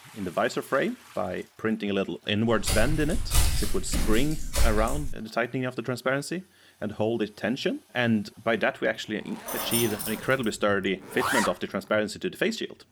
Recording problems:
household noises; loud; throughout; 7 dB below the speech
footsteps; loud; from 2.5 to 5 s; peak 3 dB above the speech
jangling keys; loud; at 9.5 s; peak 1 dB above the speech

